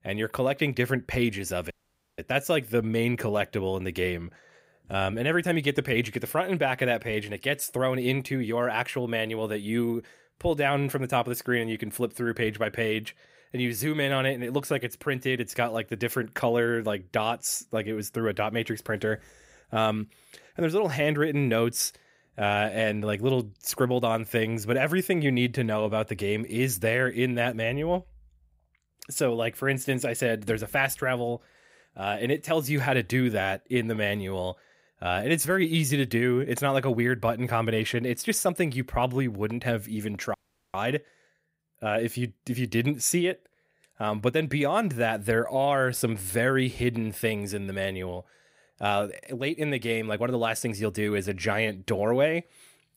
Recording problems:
audio cutting out; at 1.5 s and at 40 s

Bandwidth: 15.5 kHz